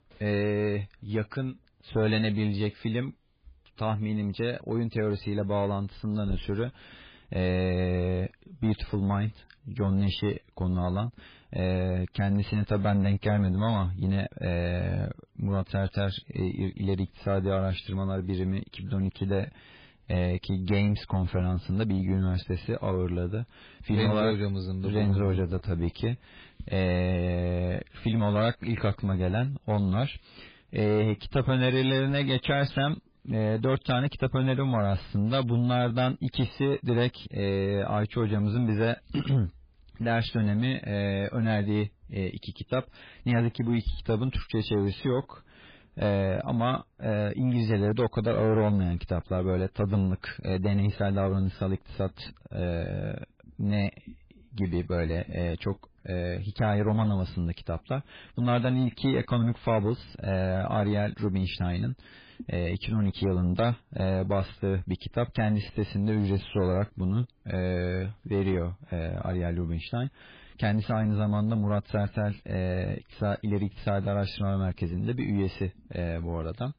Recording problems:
garbled, watery; badly; nothing above 4 kHz
distortion; slight; 10 dB below the speech

